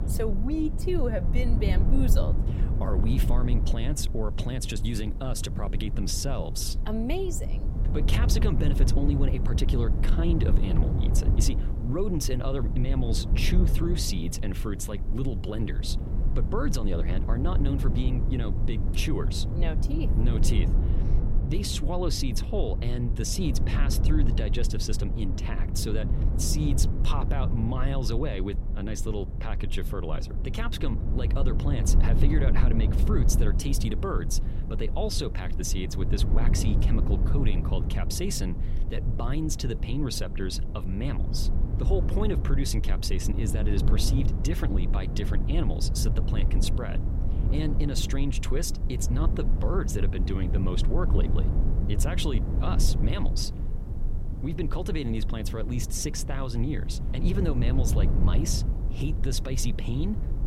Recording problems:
low rumble; loud; throughout; 7 dB below the speech
hiss; faint; until 21 s and from 33 s on; 25 dB below the speech

